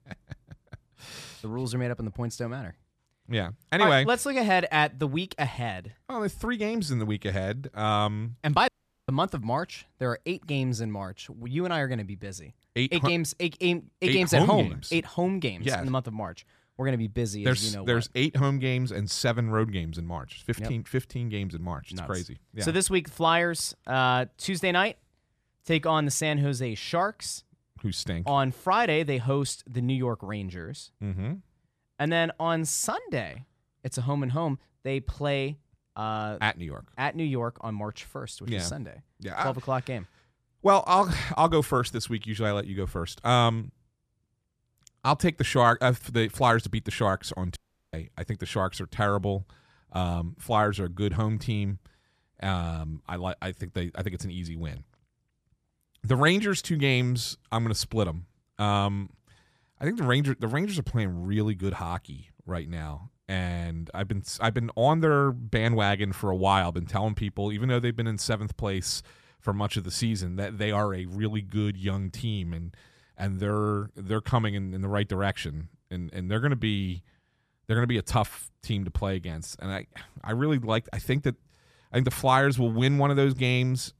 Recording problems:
audio cutting out; at 8.5 s and at 48 s

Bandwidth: 14.5 kHz